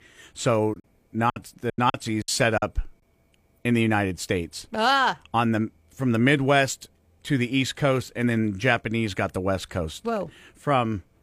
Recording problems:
choppy; very; from 0.5 to 2.5 s; 19% of the speech affected

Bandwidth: 15 kHz